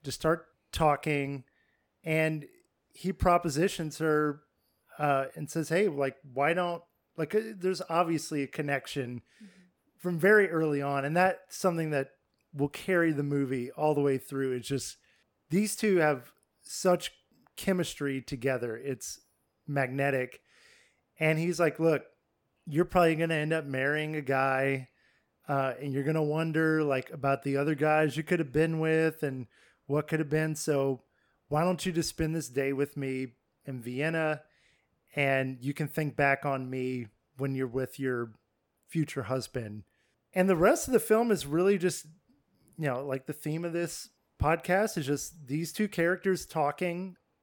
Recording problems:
none

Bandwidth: 18 kHz